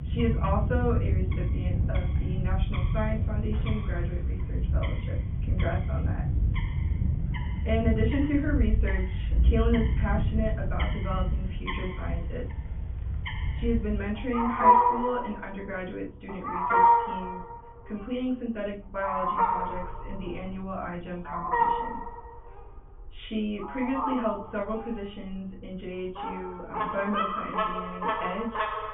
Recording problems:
off-mic speech; far
high frequencies cut off; severe; nothing above 3.5 kHz
room echo; slight; dies away in 0.3 s
animal sounds; very loud; throughout; 5 dB above the speech

